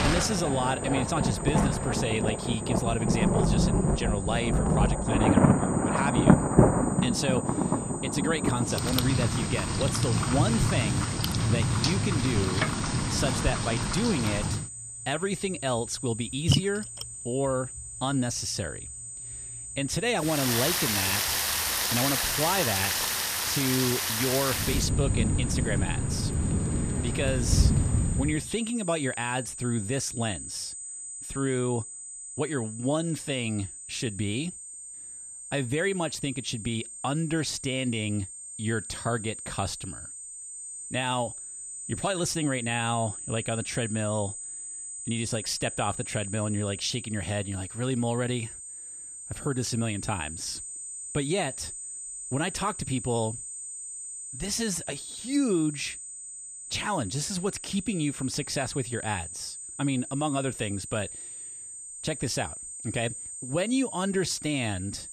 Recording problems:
rain or running water; very loud; until 28 s; 4 dB above the speech
high-pitched whine; loud; throughout; 8 kHz, 7 dB below the speech

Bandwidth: 15 kHz